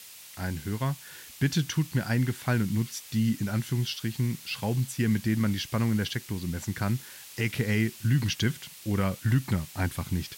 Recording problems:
hiss; noticeable; throughout; 15 dB below the speech

